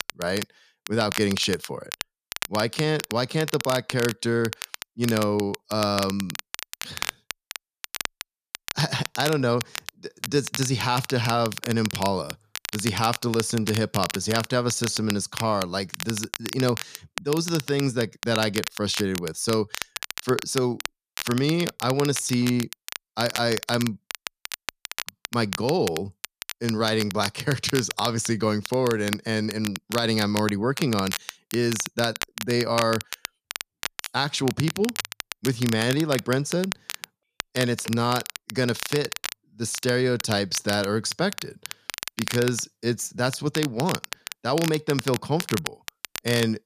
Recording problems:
crackle, like an old record; loud; 8 dB below the speech

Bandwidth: 14.5 kHz